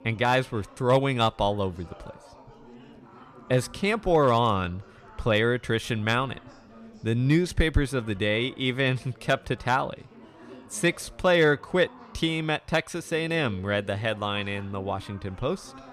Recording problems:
chatter from many people; faint; throughout; 25 dB below the speech

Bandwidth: 14.5 kHz